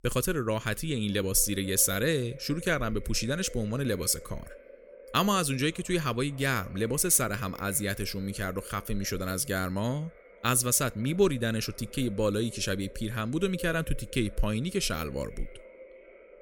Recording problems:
echo of what is said; faint; throughout; 560 ms later, 20 dB below the speech

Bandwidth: 17.5 kHz